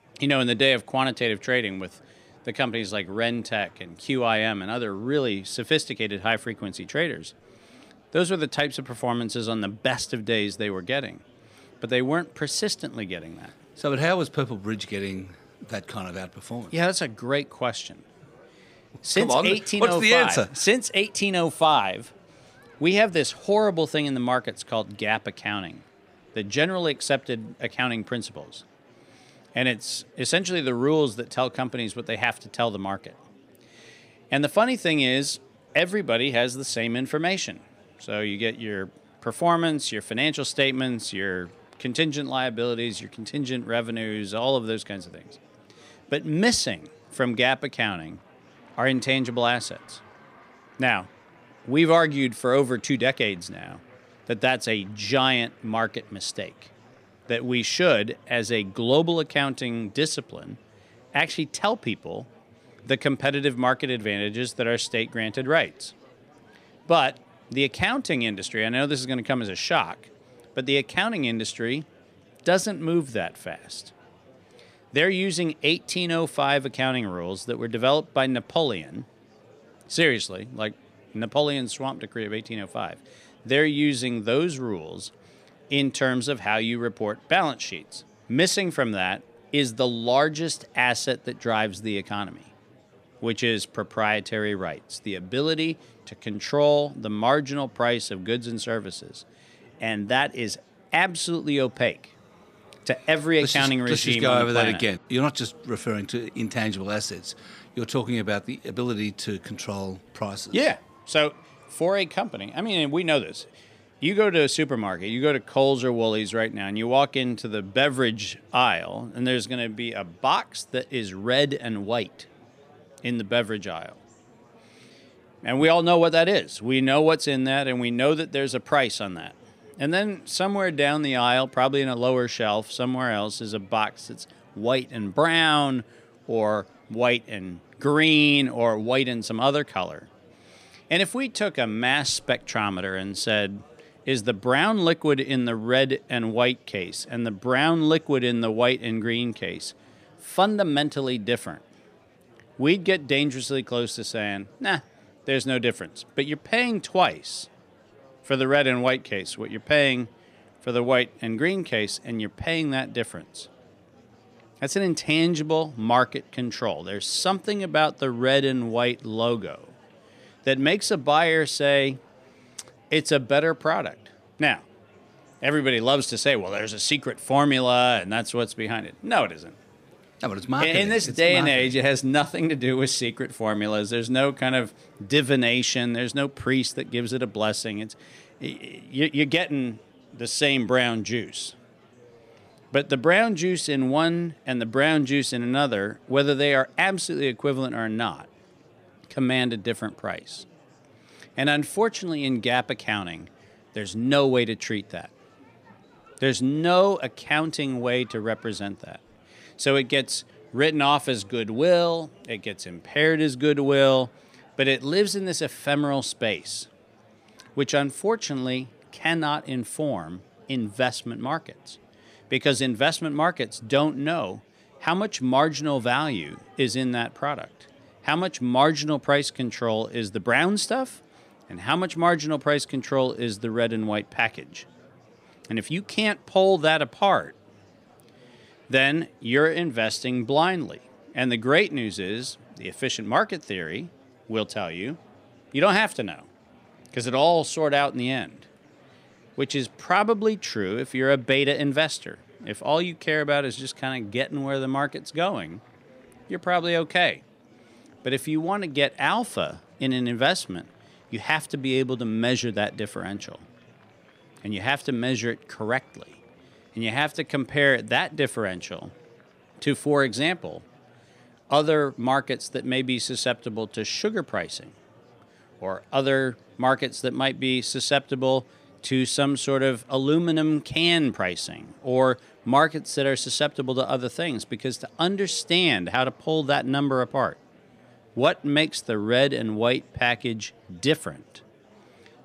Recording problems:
murmuring crowd; faint; throughout; 30 dB below the speech

